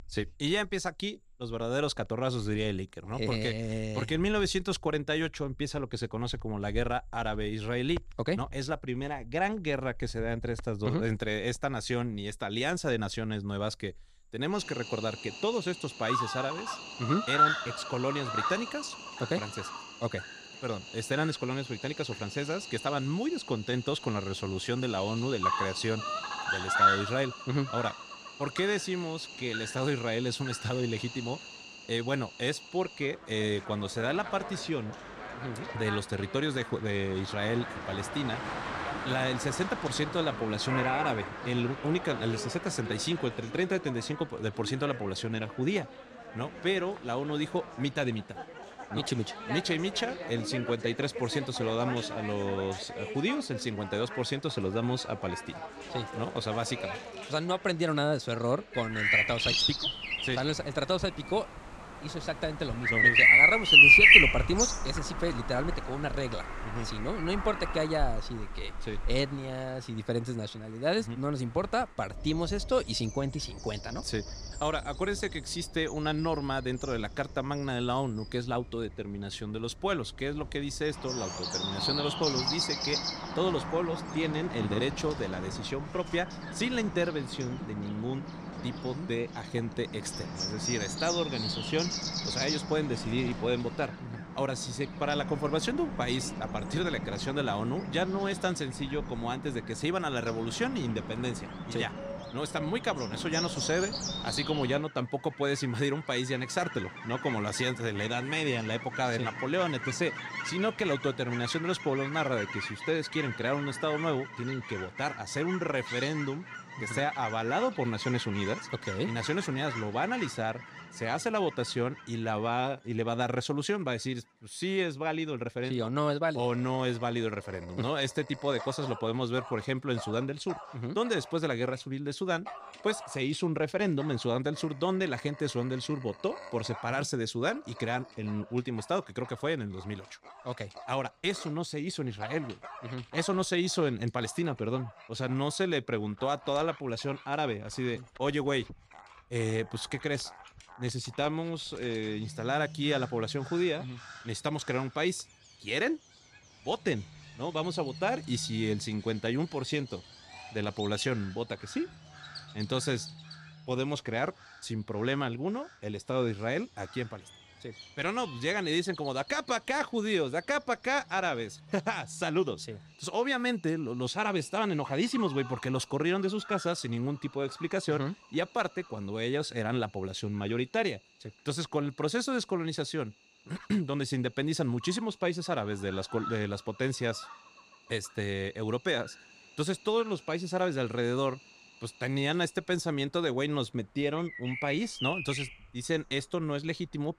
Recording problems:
animal sounds; very loud; throughout; 2 dB above the speech

